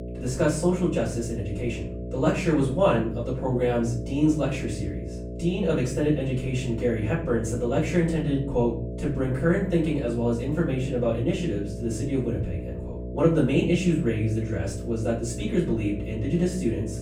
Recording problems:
off-mic speech; far
room echo; slight; dies away in 0.4 s
electrical hum; noticeable; throughout; 60 Hz, 10 dB below the speech

